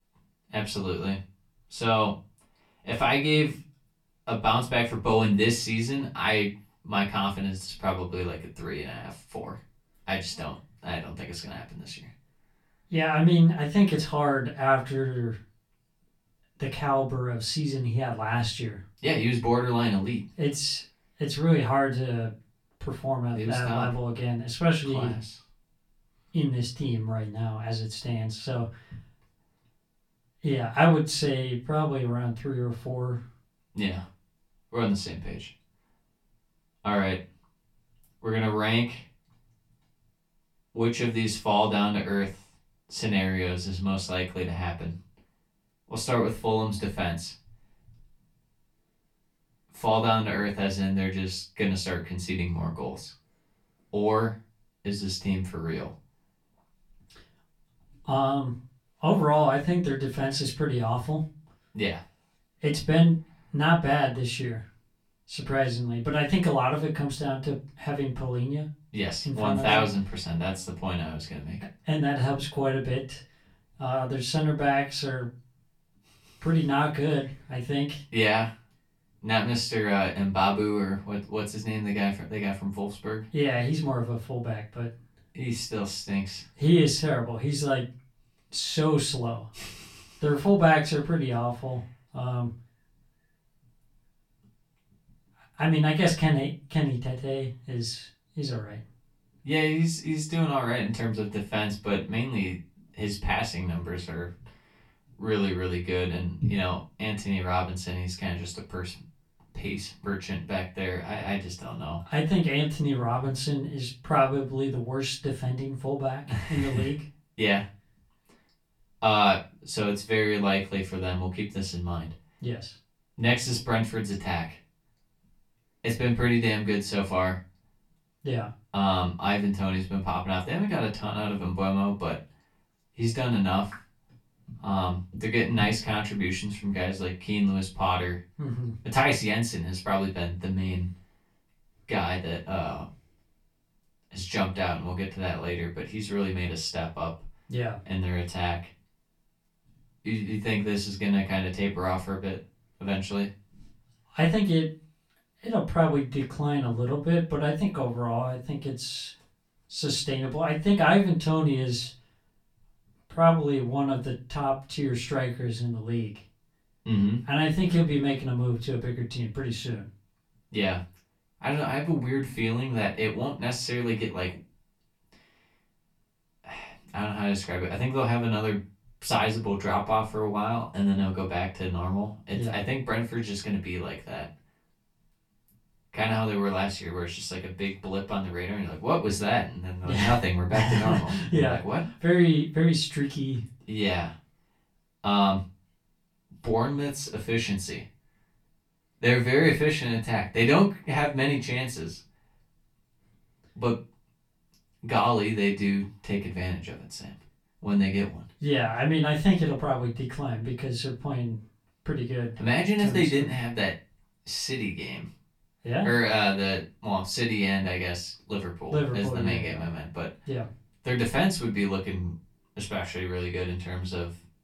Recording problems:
off-mic speech; far
room echo; very slight; dies away in 0.2 s

